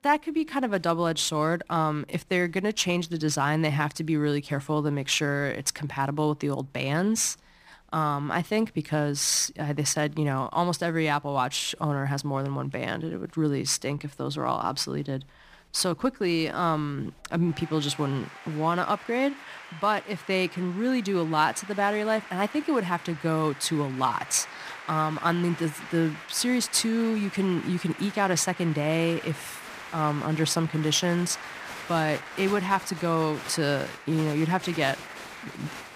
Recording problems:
crowd noise; noticeable; throughout; 15 dB below the speech

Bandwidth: 15 kHz